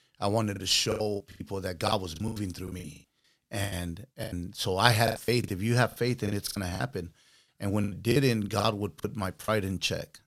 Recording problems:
choppy; very; 15% of the speech affected

